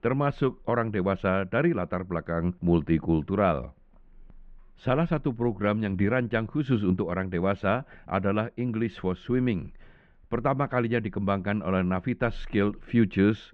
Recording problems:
muffled; very; fading above 2.5 kHz

